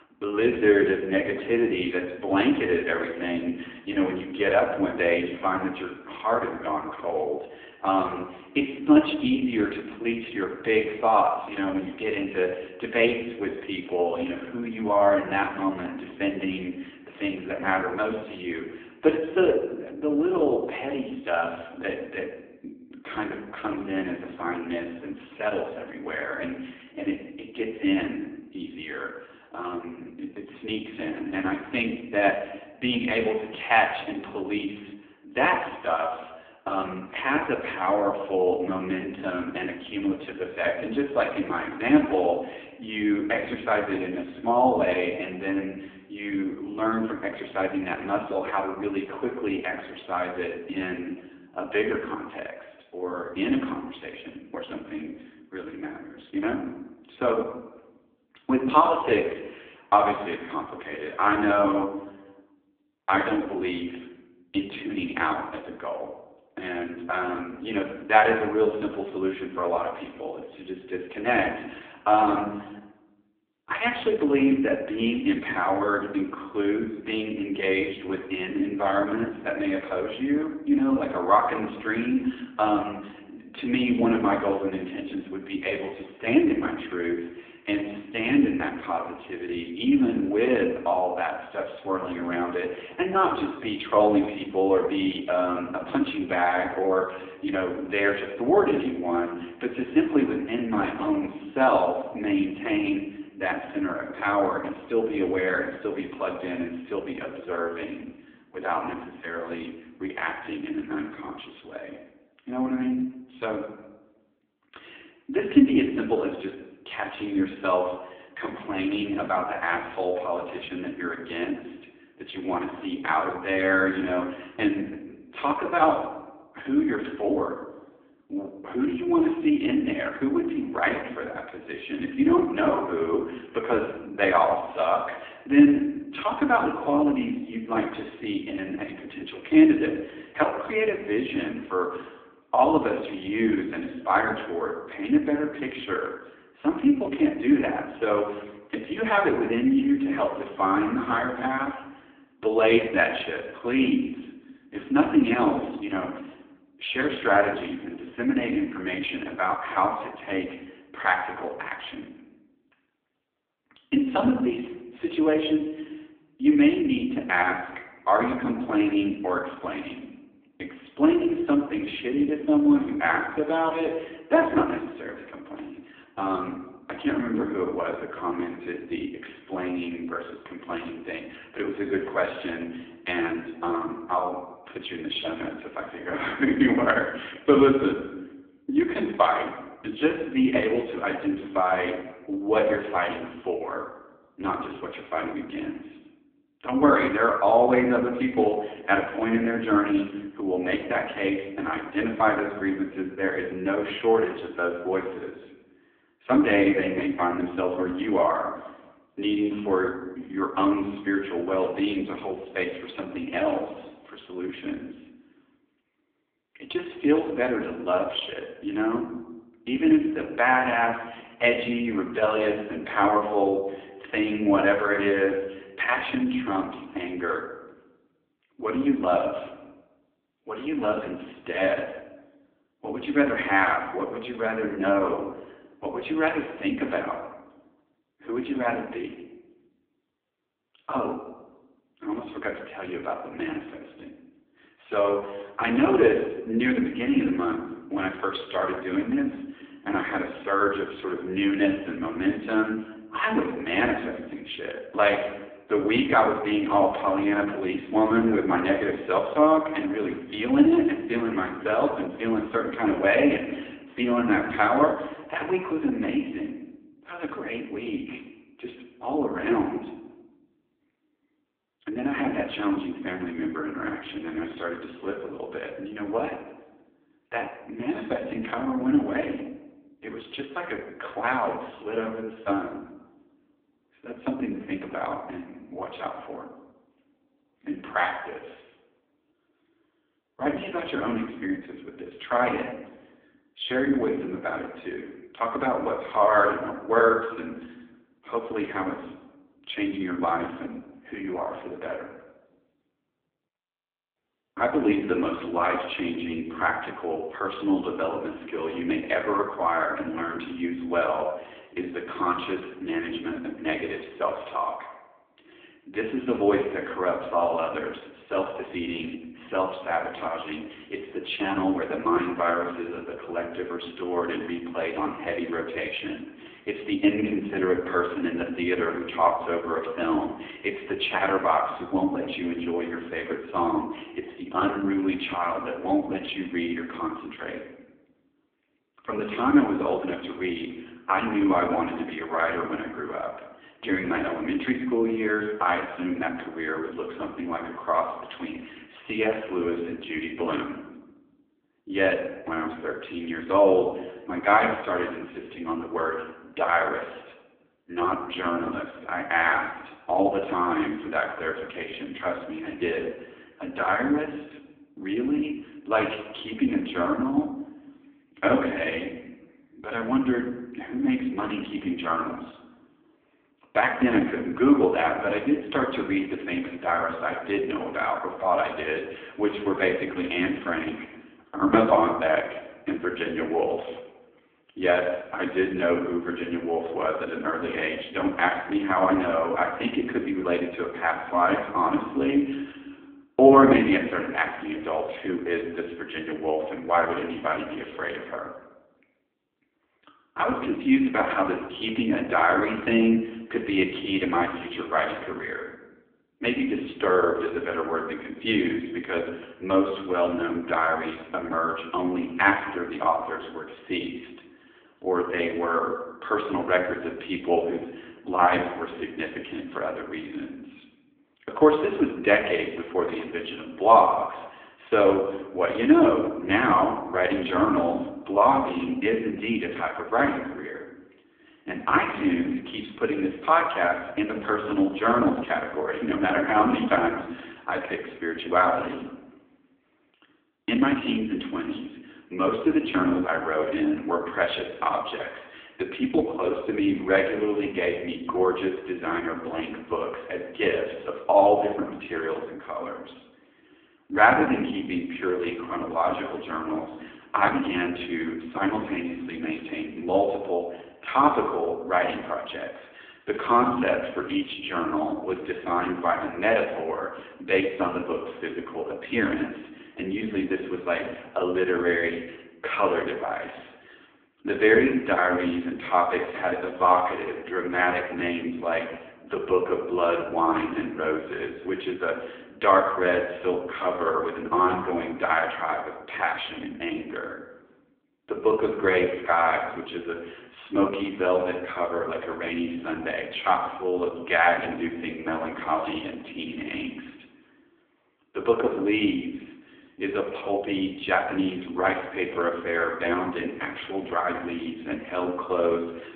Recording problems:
phone-call audio; poor line
room echo; slight; dies away in 0.8 s
off-mic speech; somewhat distant

